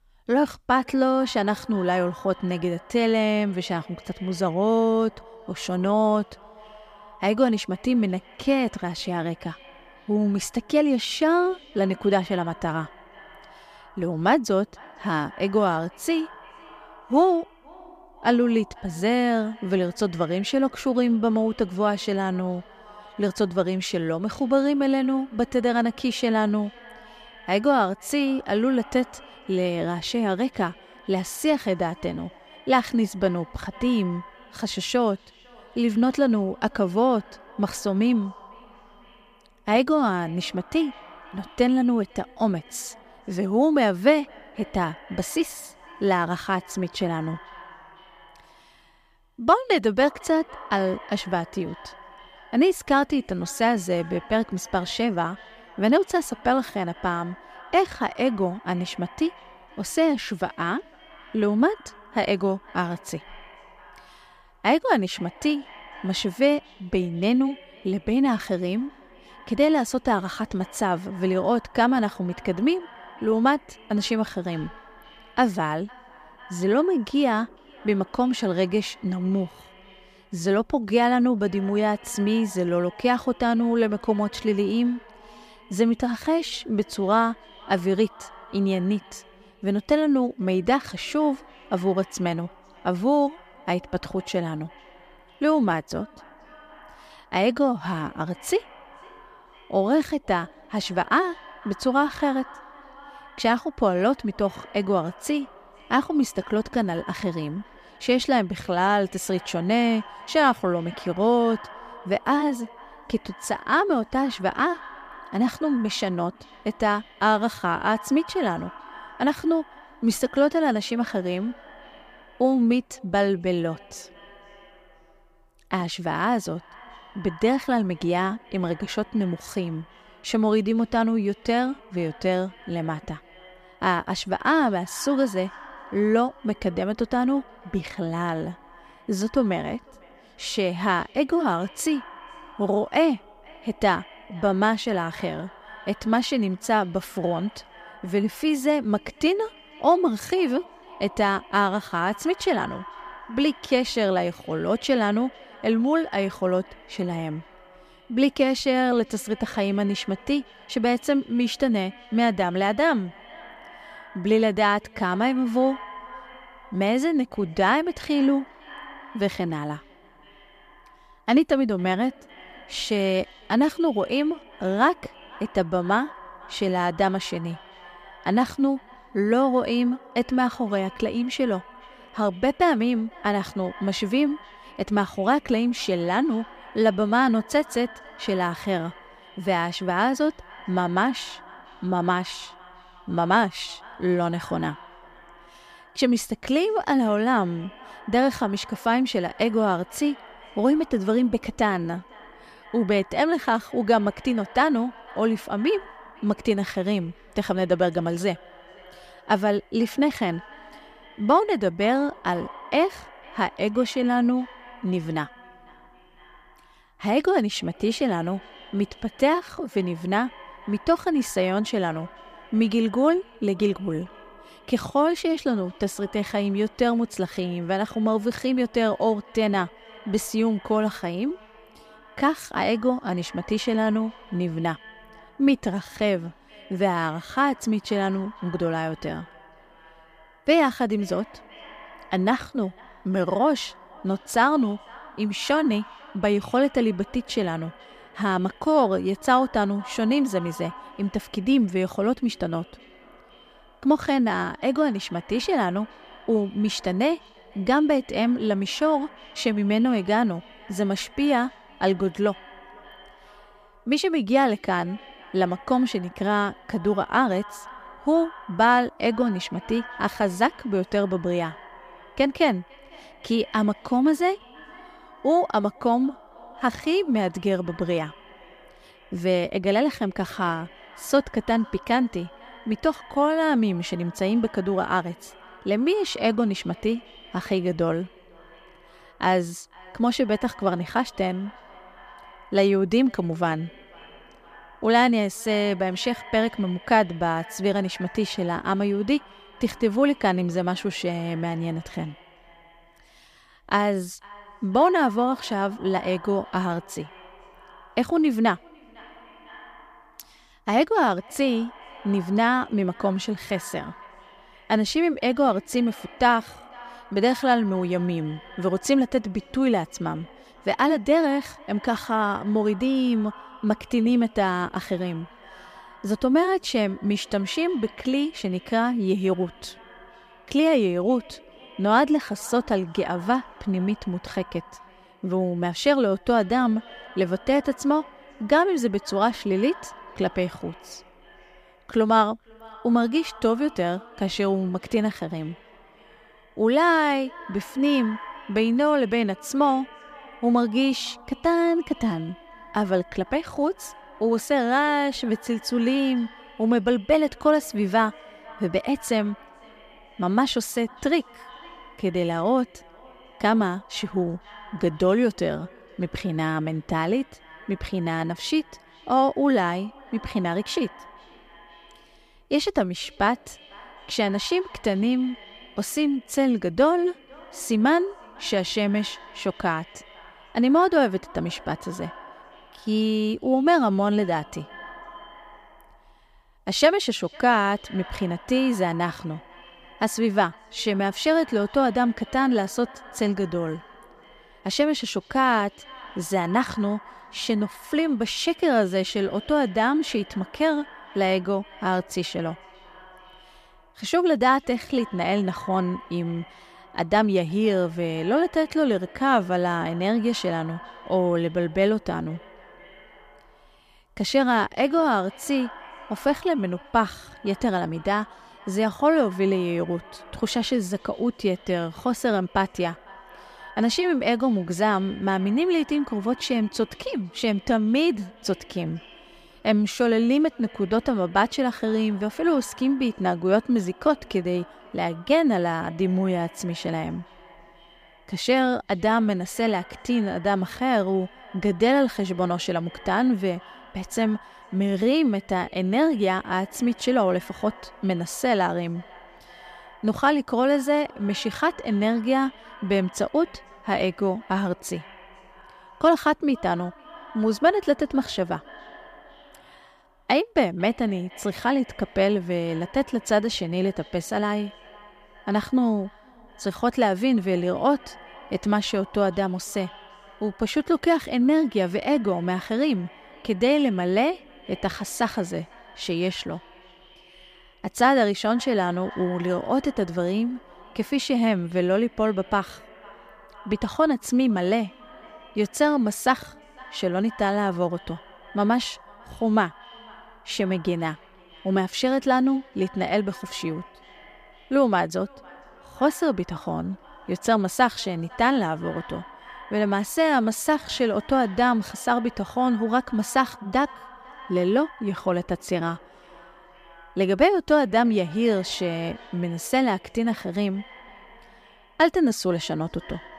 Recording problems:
echo of what is said; faint; throughout; 500 ms later, 20 dB below the speech

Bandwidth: 15 kHz